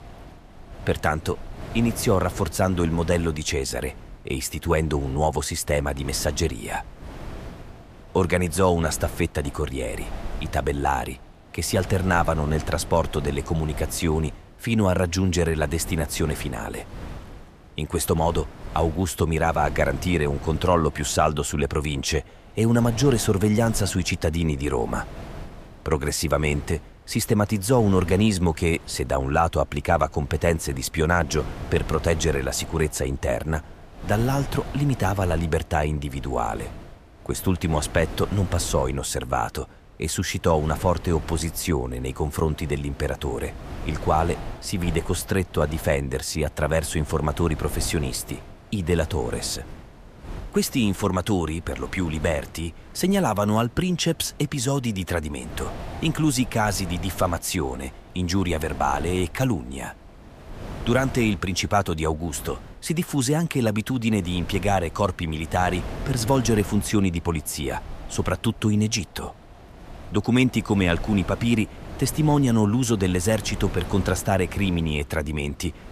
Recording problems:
wind noise on the microphone; occasional gusts; 15 dB below the speech

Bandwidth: 14.5 kHz